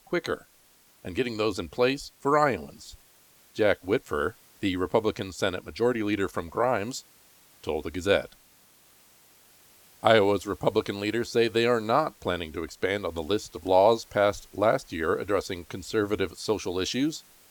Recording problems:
hiss; faint; throughout; 30 dB below the speech

